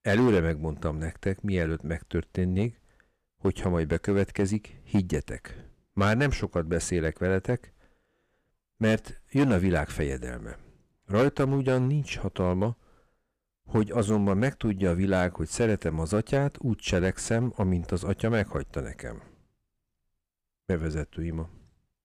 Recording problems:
distortion; slight; 4% of the sound clipped

